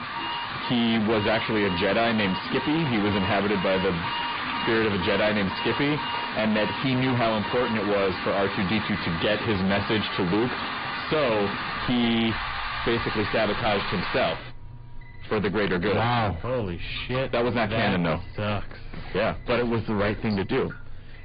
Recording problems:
distortion; heavy; 5 dB below the speech
high frequencies cut off; severe; nothing above 4.5 kHz
garbled, watery; slightly
rain or running water; loud; throughout; 7 dB below the speech
alarms or sirens; noticeable; throughout; 10 dB below the speech
animal sounds; noticeable; throughout; 15 dB below the speech

